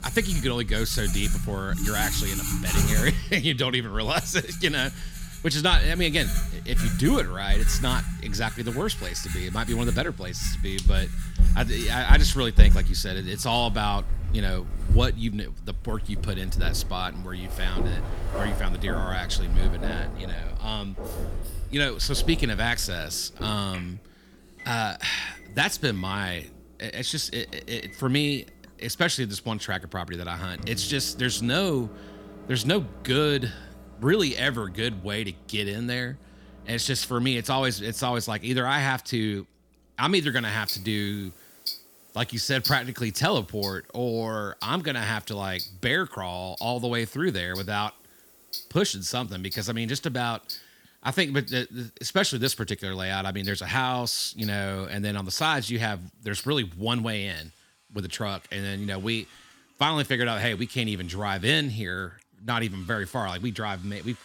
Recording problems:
household noises; loud; throughout; 4 dB below the speech

